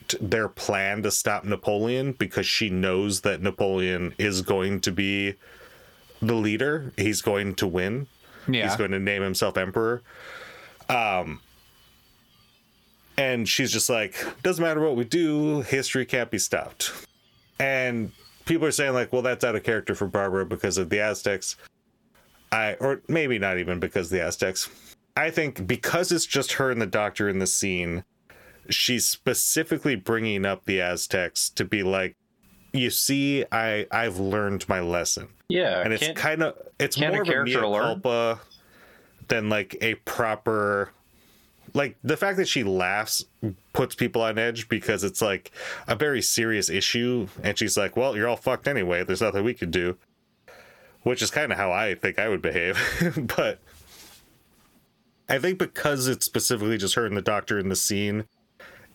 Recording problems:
squashed, flat; somewhat

